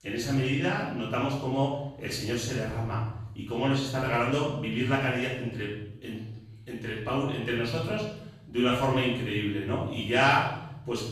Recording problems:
off-mic speech; far
room echo; noticeable; dies away in 0.8 s

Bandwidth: 14 kHz